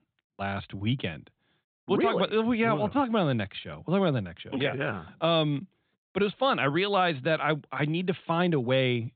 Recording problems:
high frequencies cut off; severe; nothing above 4 kHz

